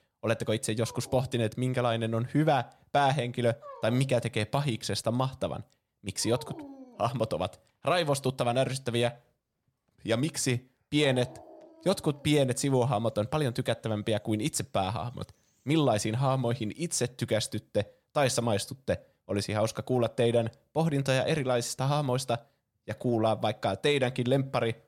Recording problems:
animal sounds; faint; until 17 s; 20 dB below the speech

